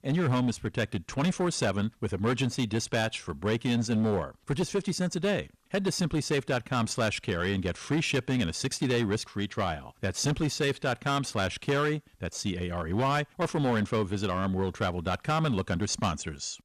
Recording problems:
distortion; slight; 9% of the sound clipped

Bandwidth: 14 kHz